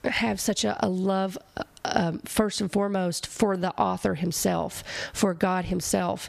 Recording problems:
squashed, flat; heavily

